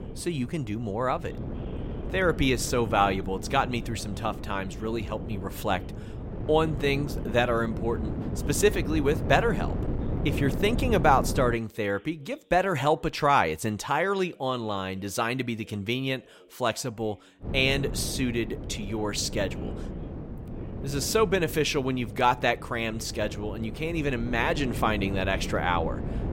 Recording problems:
wind noise on the microphone; occasional gusts; until 12 s and from 17 s on; 15 dB below the speech
voice in the background; faint; throughout; 25 dB below the speech

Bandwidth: 16 kHz